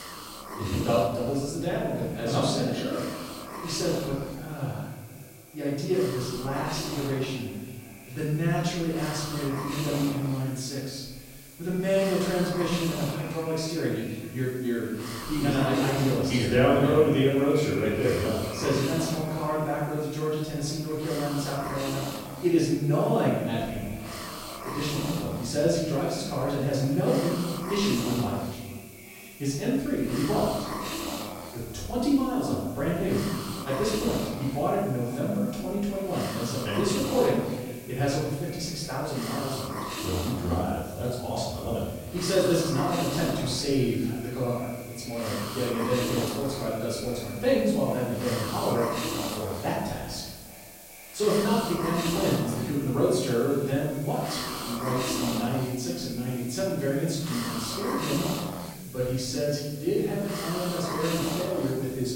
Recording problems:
off-mic speech; far
echo of what is said; noticeable; throughout; 400 ms later, 15 dB below the speech
room echo; noticeable; dies away in 1.1 s
hiss; loud; throughout; 8 dB below the speech

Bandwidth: 16 kHz